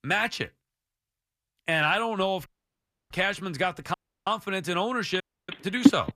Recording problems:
audio cutting out; at 2.5 s for 0.5 s, at 4 s and at 5 s
phone ringing; very faint; at 6 s; peak 7 dB above the speech

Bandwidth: 14.5 kHz